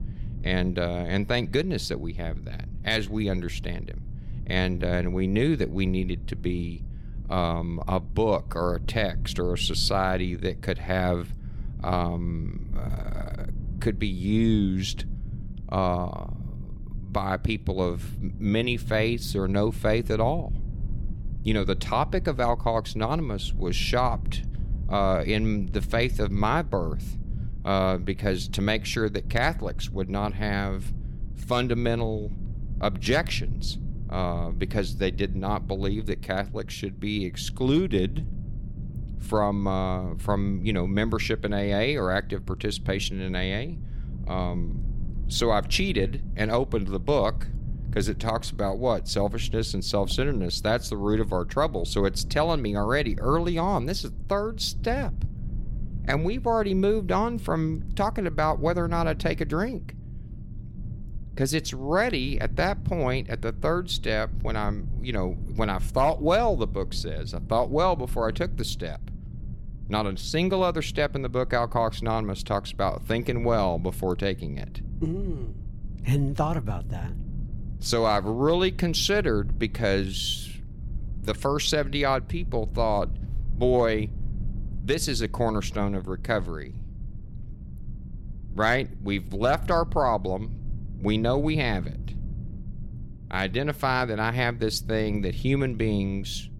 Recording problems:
low rumble; faint; throughout; 20 dB below the speech

